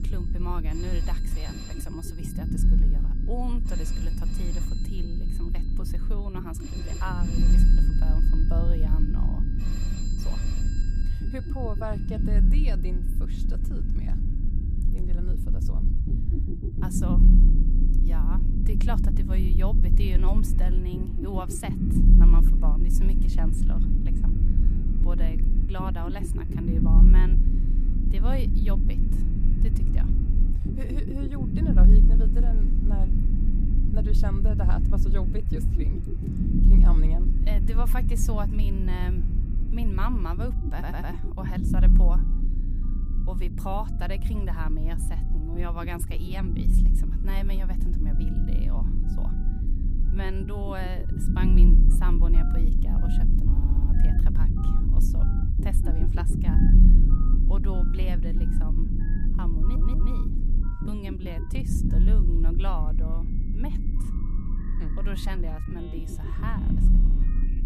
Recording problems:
low rumble; loud; throughout; 1 dB below the speech
alarms or sirens; noticeable; throughout; 15 dB below the speech
audio stuttering; at 41 s, at 54 s and at 1:00

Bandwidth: 15 kHz